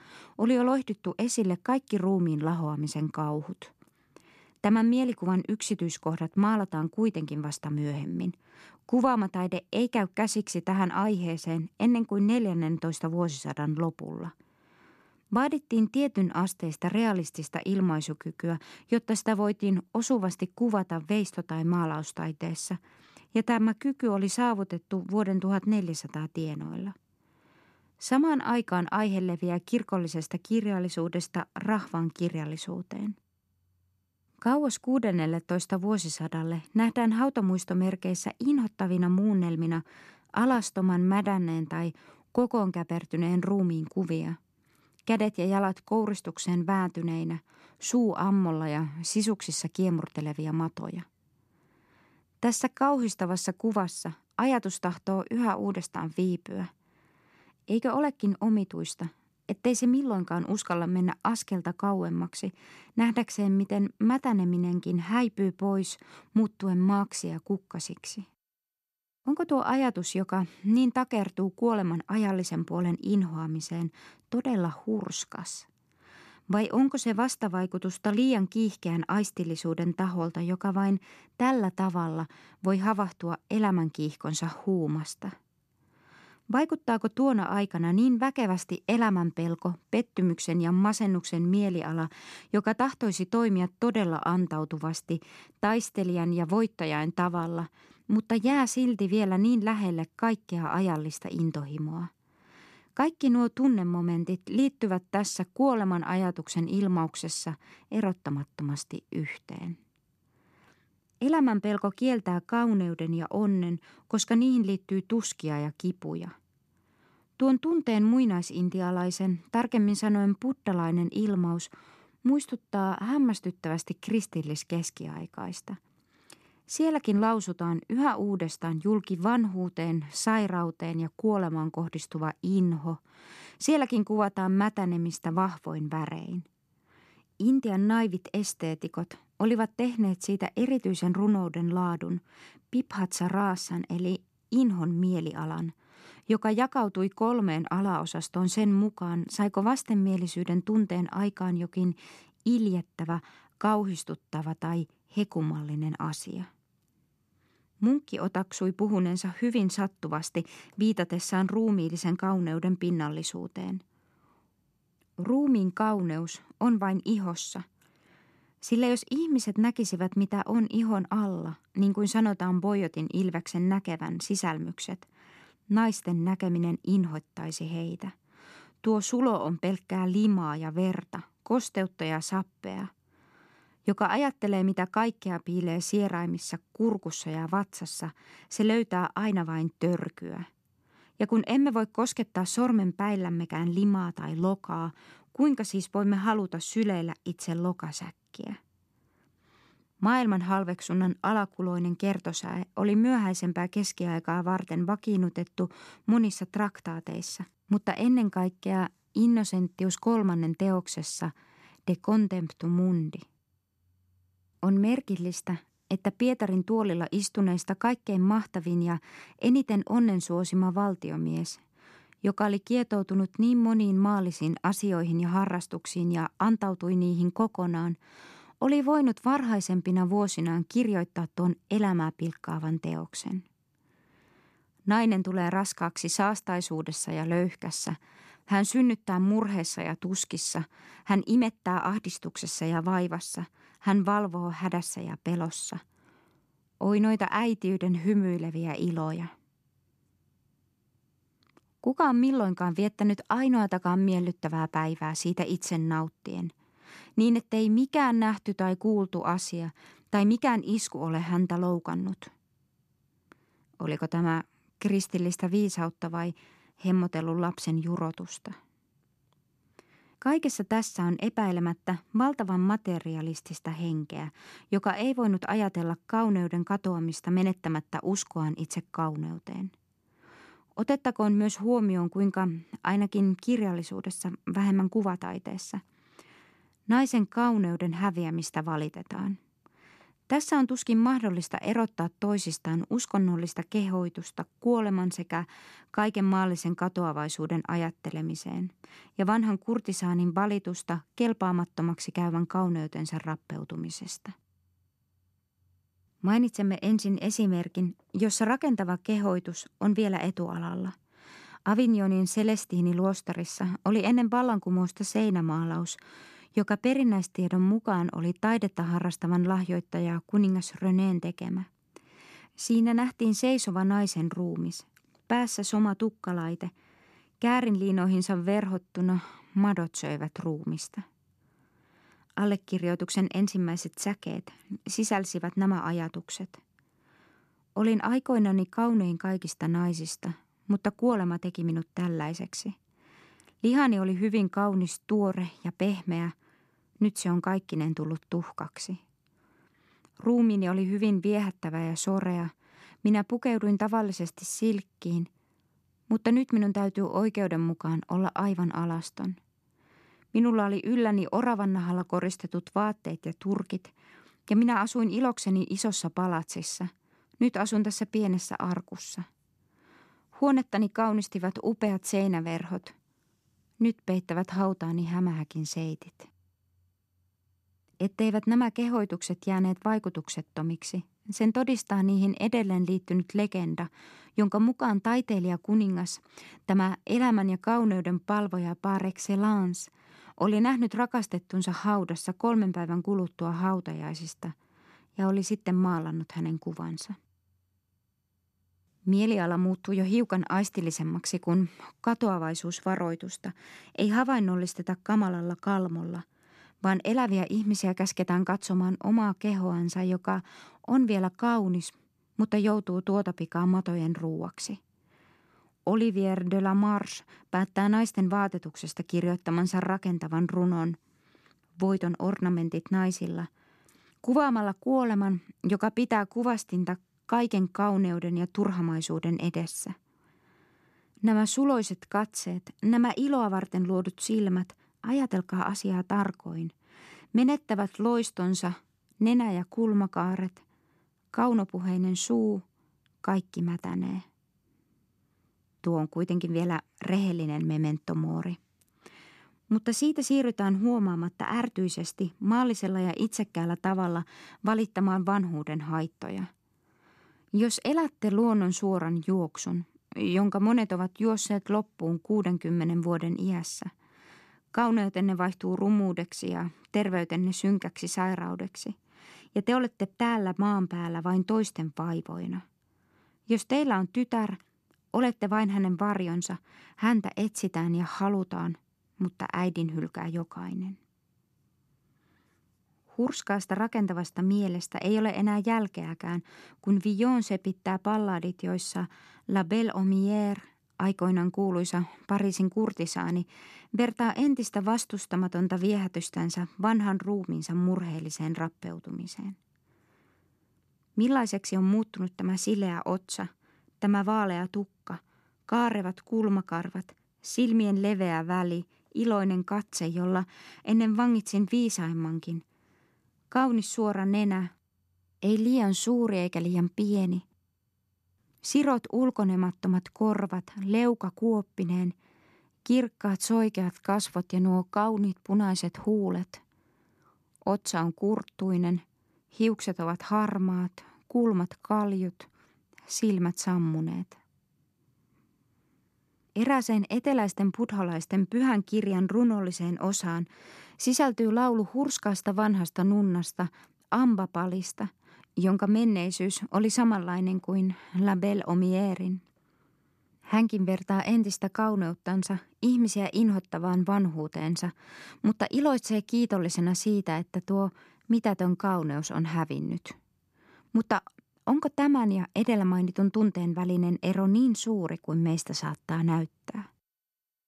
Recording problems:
none

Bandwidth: 13.5 kHz